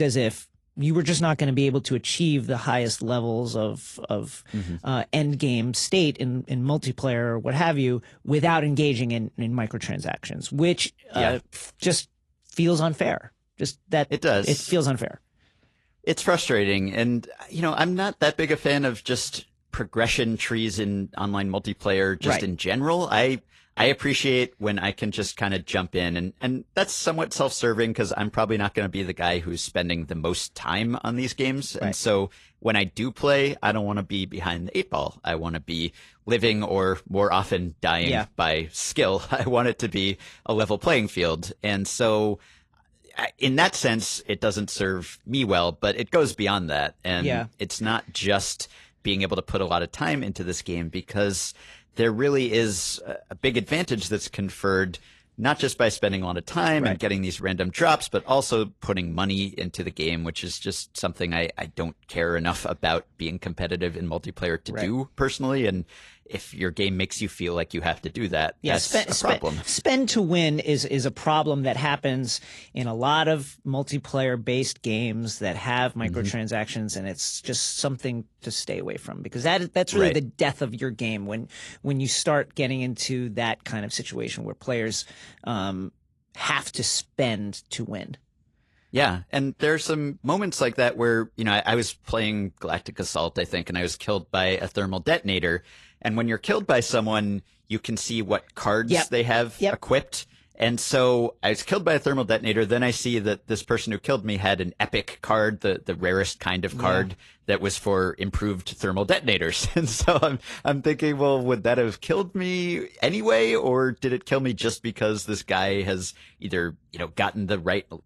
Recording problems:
garbled, watery; slightly; nothing above 11 kHz
abrupt cut into speech; at the start

